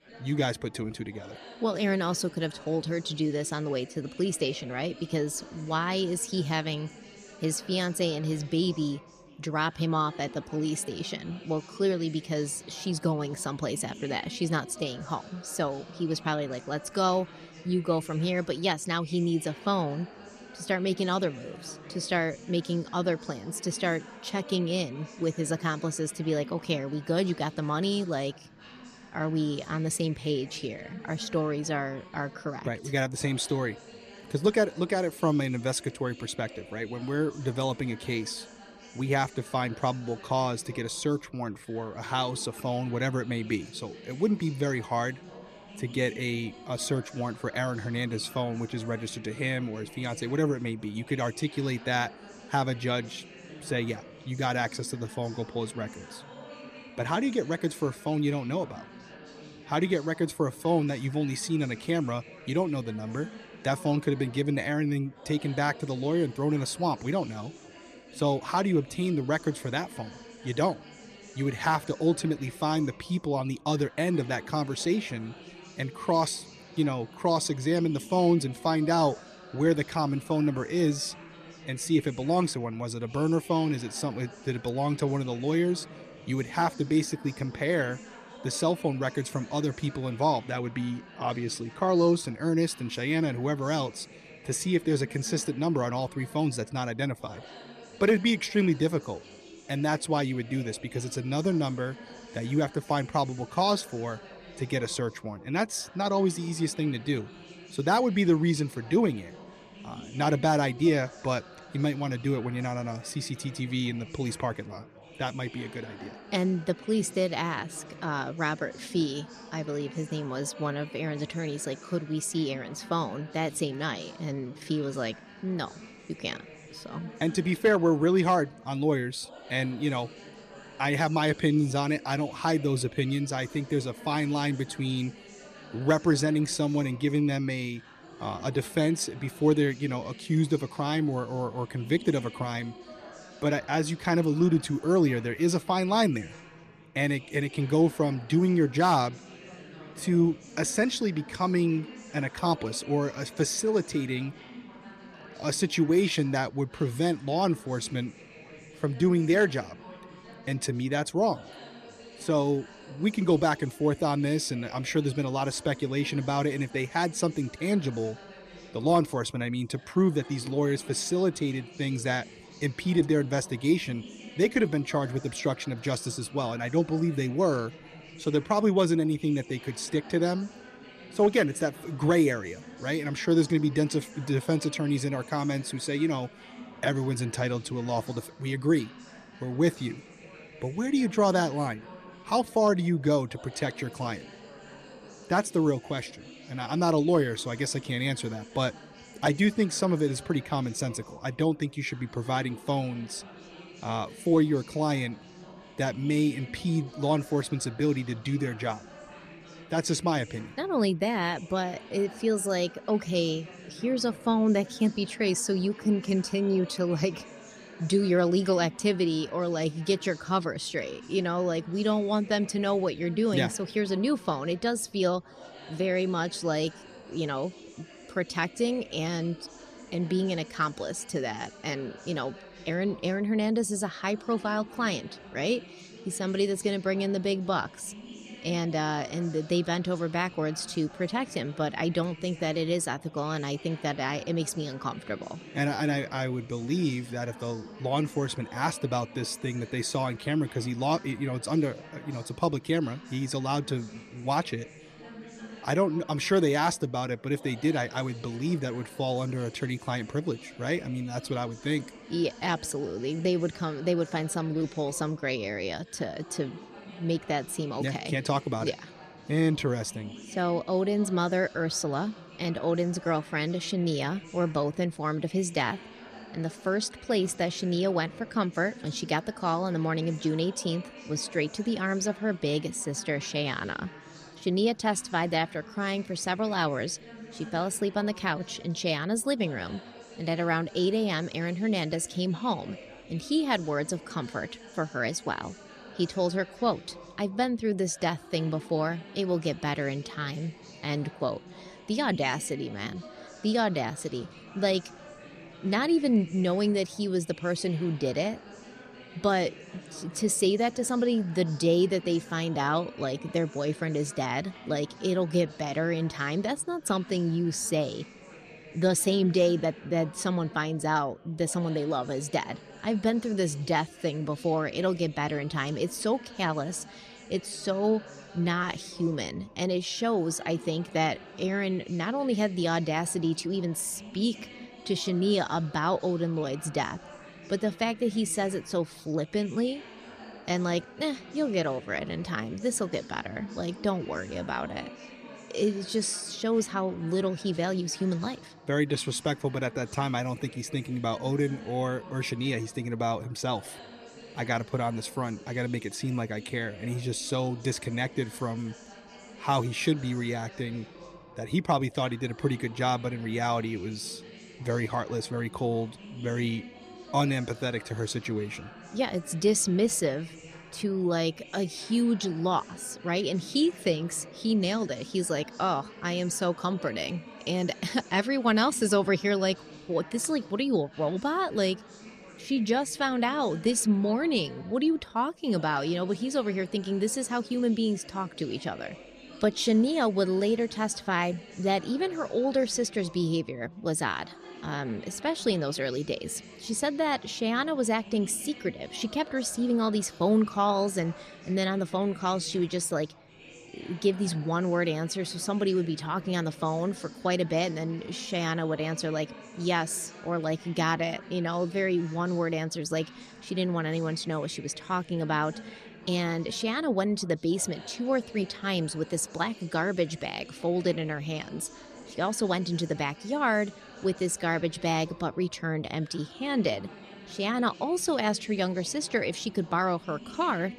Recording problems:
chatter from many people; noticeable; throughout; 20 dB below the speech

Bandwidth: 14.5 kHz